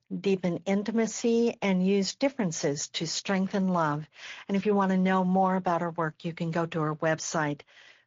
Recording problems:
high frequencies cut off; noticeable; nothing above 7 kHz
garbled, watery; slightly

